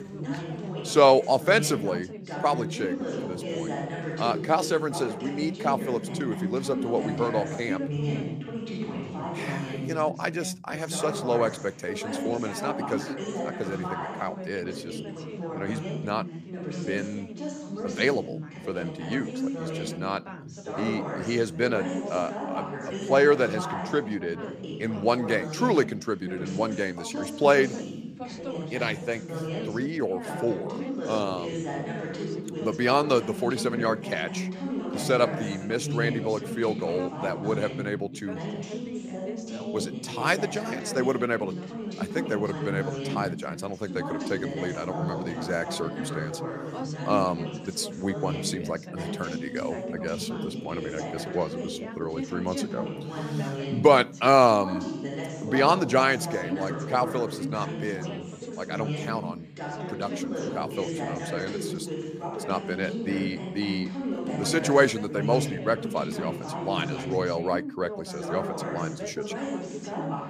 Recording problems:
background chatter; loud; throughout; 2 voices, 6 dB below the speech

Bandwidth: 15 kHz